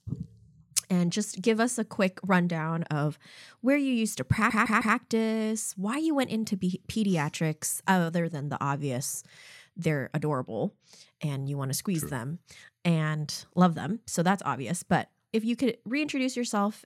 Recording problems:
audio stuttering; at 4.5 s

